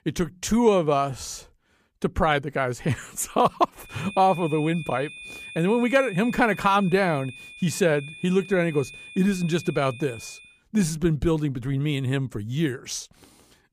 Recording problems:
high-pitched whine; noticeable; from 4 to 10 s; 2.5 kHz, 15 dB below the speech

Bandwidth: 15 kHz